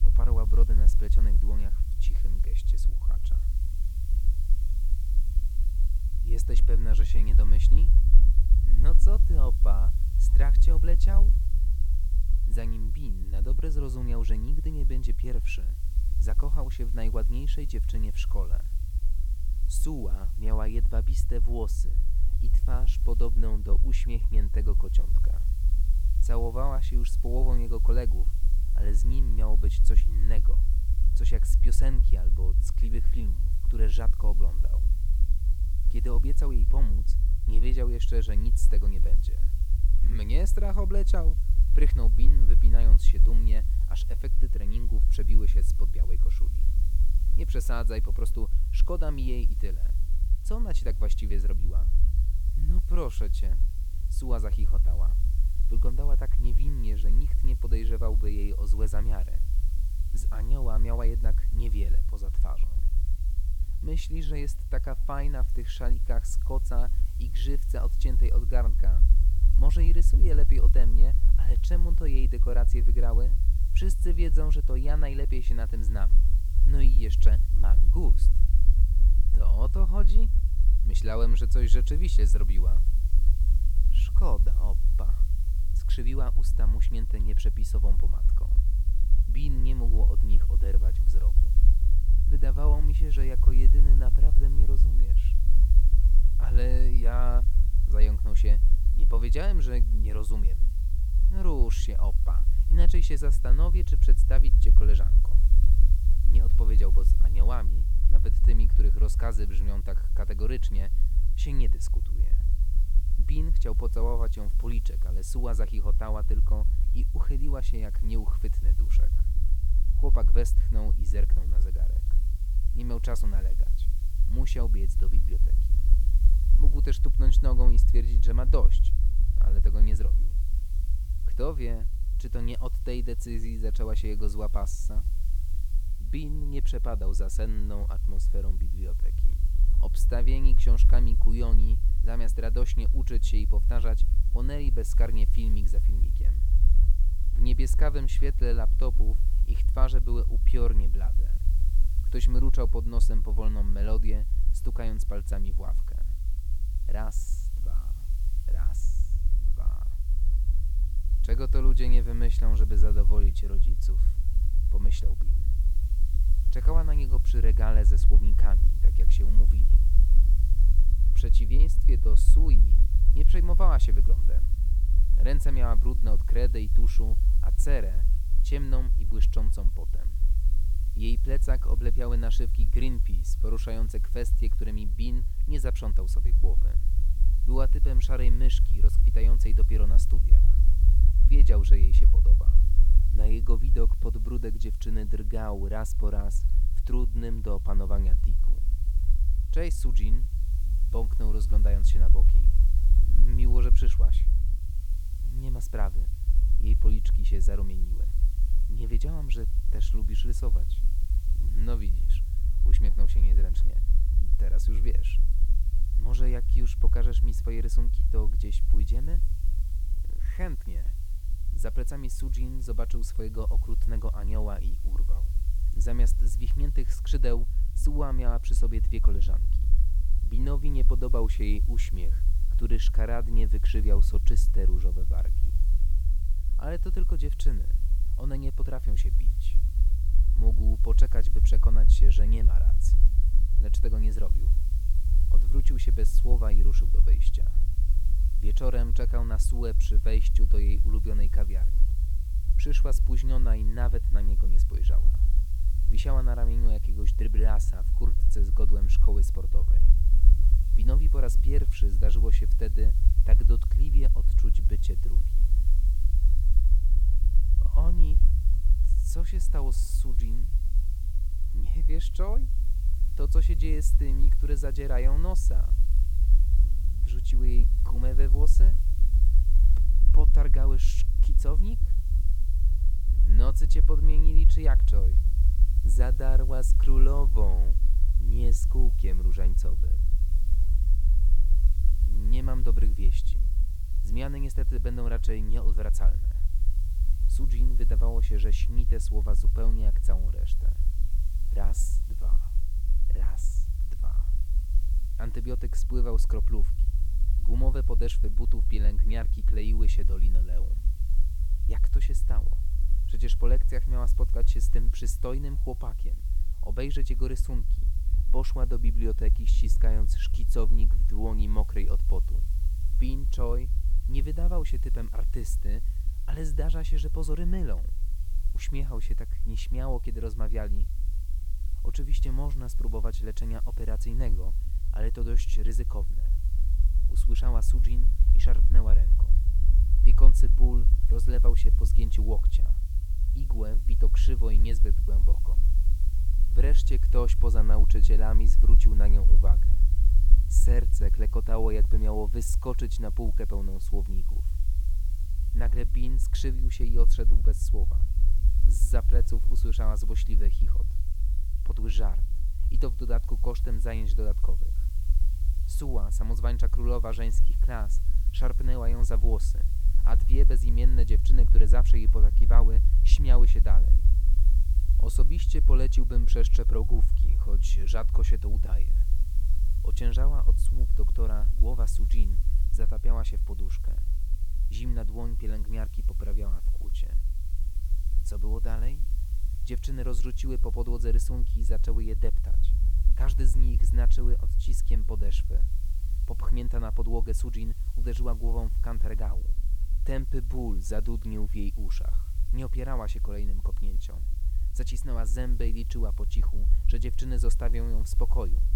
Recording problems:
low rumble; loud; throughout; 9 dB below the speech
hiss; noticeable; throughout; 15 dB below the speech

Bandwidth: 18 kHz